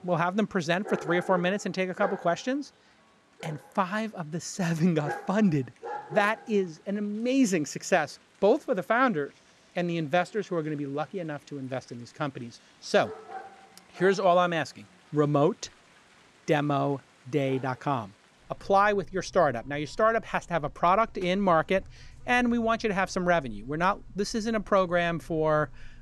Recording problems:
animal sounds; noticeable; throughout; 20 dB below the speech

